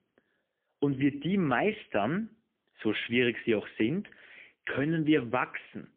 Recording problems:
phone-call audio; poor line; nothing above 3.5 kHz

